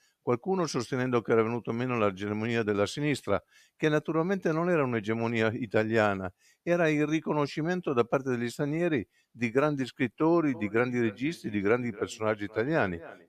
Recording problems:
echo of what is said; faint; from 11 s on; 280 ms later, 20 dB below the speech

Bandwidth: 14.5 kHz